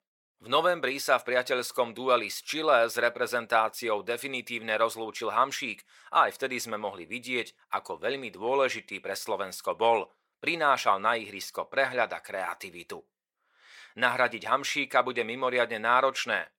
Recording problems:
thin; very; fading below 550 Hz

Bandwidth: 17 kHz